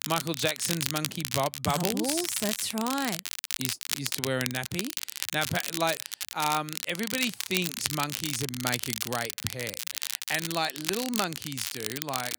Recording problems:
crackle, like an old record; loud; 1 dB below the speech

